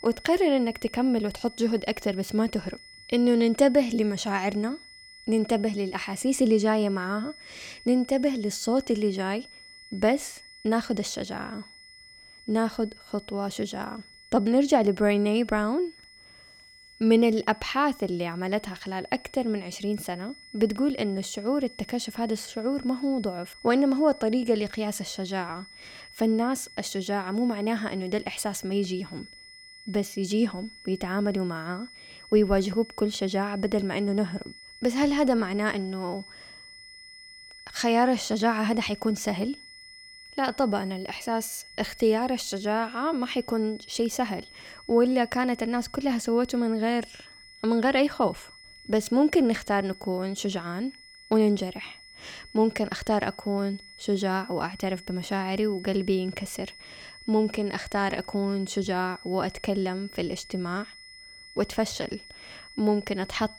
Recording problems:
high-pitched whine; noticeable; throughout; 2 kHz, 20 dB below the speech

